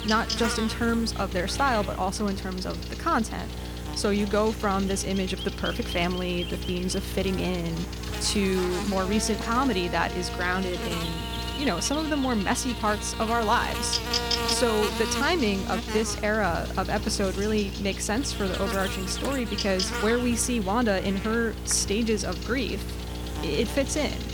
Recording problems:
electrical hum; loud; throughout; 60 Hz, 6 dB below the speech

